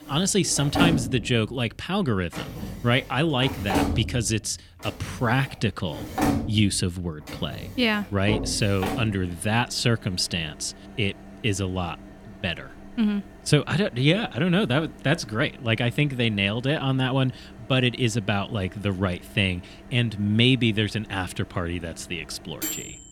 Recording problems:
household noises; loud; throughout; 8 dB below the speech

